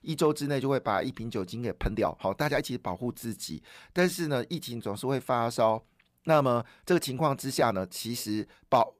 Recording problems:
uneven, jittery; strongly; from 1 to 8 s

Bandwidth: 15 kHz